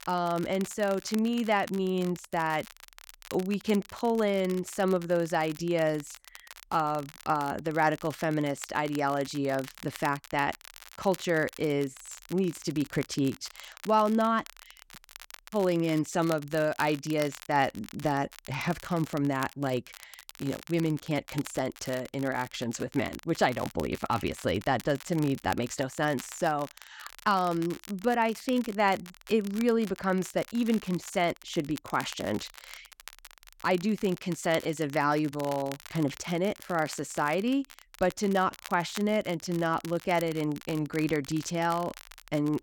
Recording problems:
crackle, like an old record; noticeable; 15 dB below the speech

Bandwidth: 17 kHz